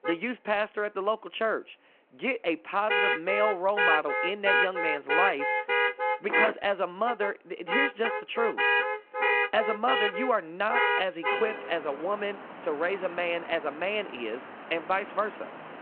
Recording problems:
phone-call audio
traffic noise; very loud; throughout; 3 dB above the speech

